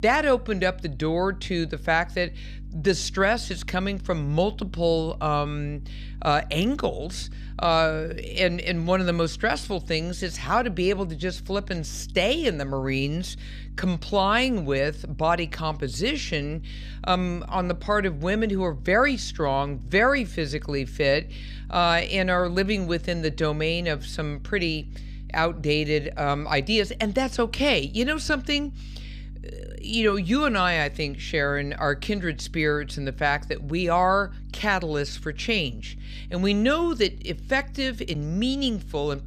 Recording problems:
electrical hum; faint; throughout; 50 Hz, 30 dB below the speech

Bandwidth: 14 kHz